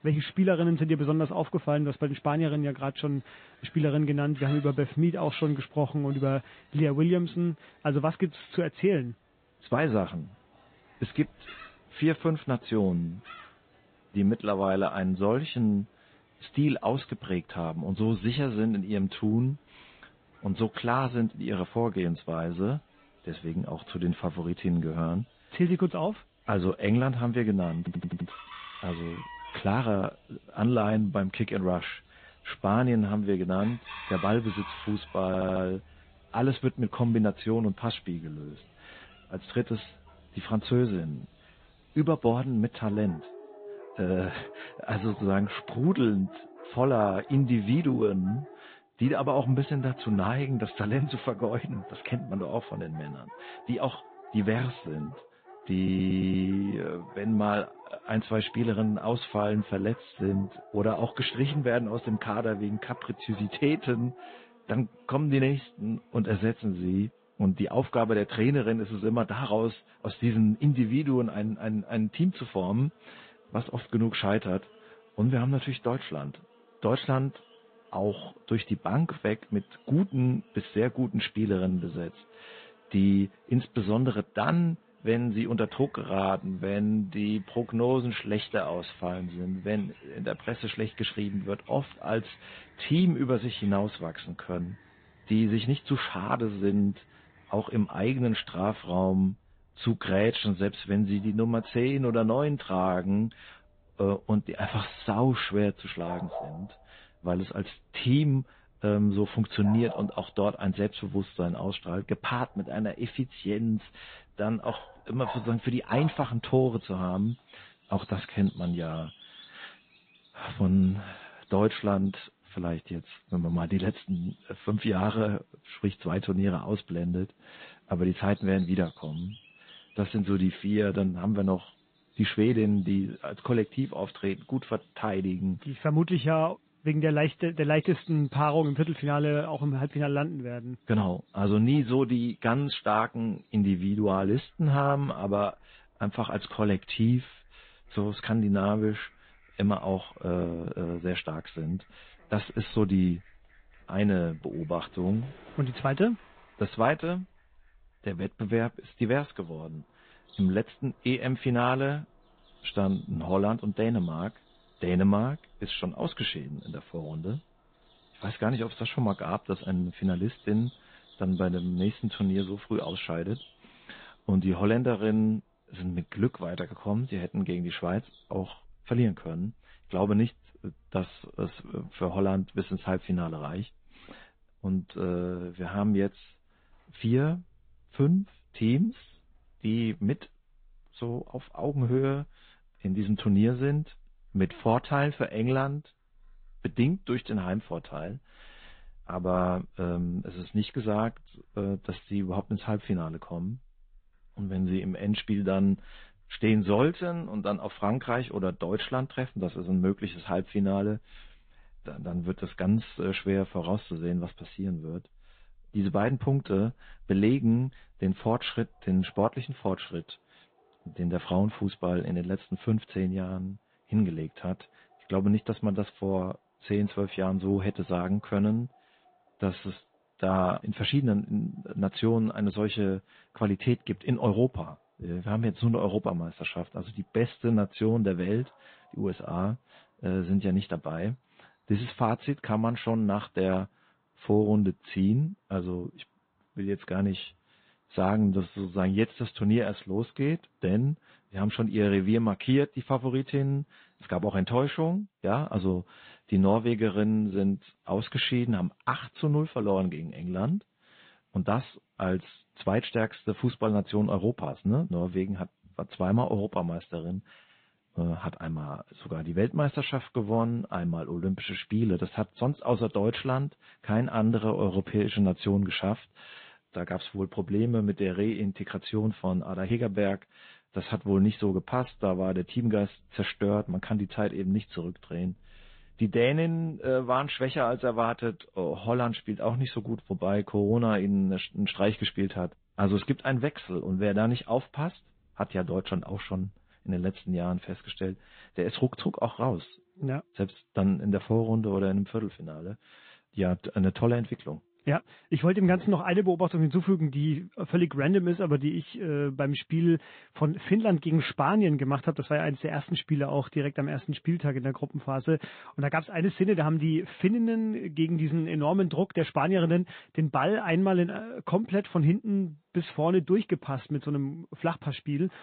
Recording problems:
high frequencies cut off; severe; nothing above 4 kHz
garbled, watery; slightly
animal sounds; faint; throughout; 25 dB below the speech
audio stuttering; at 28 s, at 35 s and at 56 s

